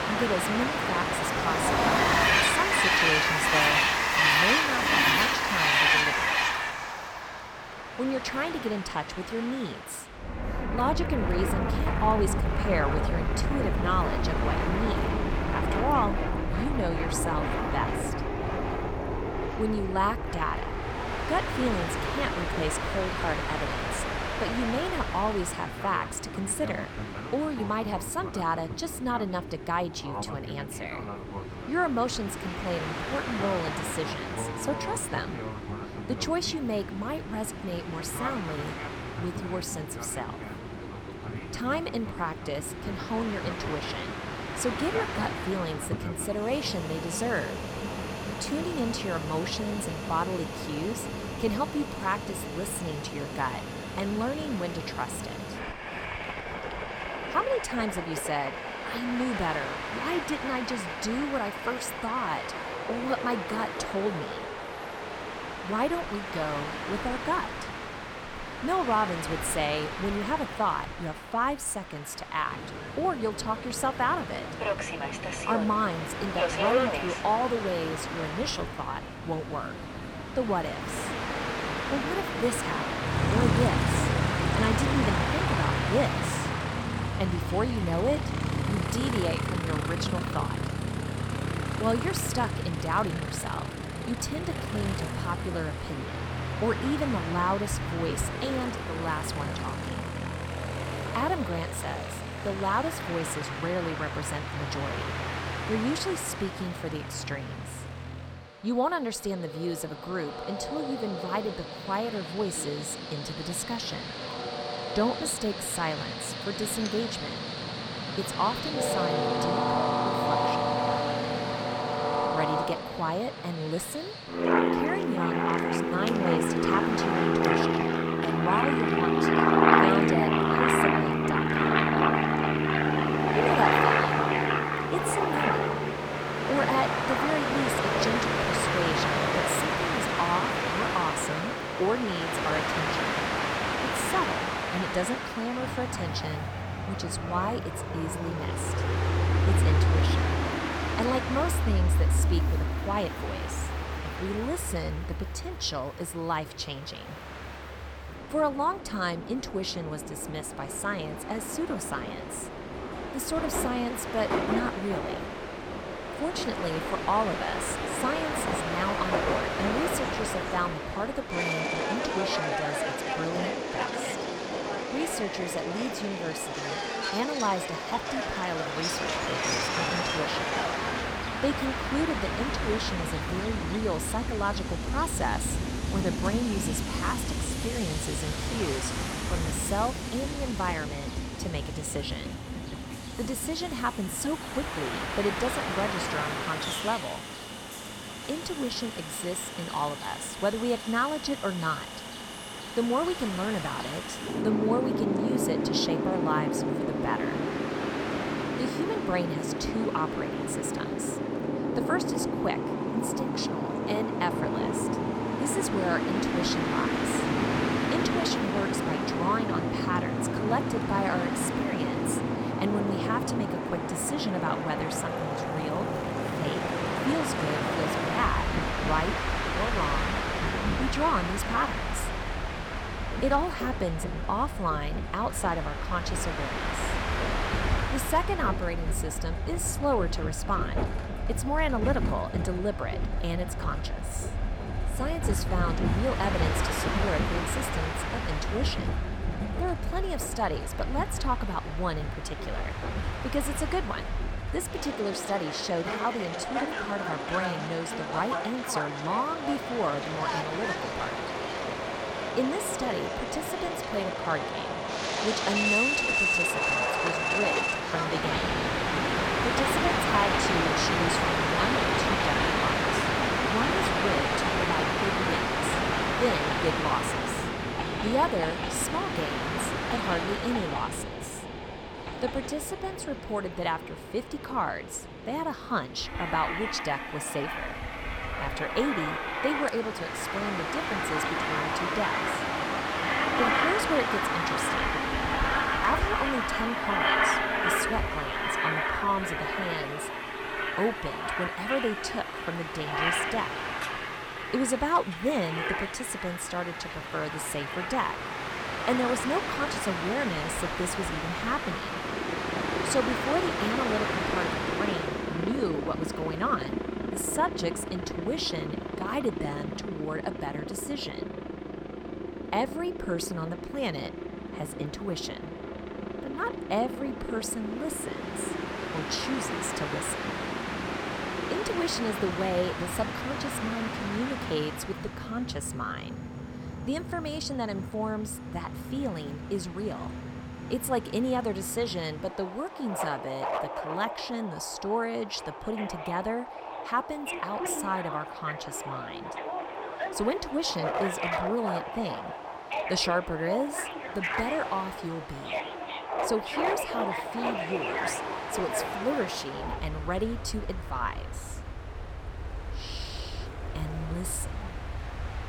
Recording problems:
train or aircraft noise; very loud; throughout; 2 dB above the speech

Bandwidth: 18.5 kHz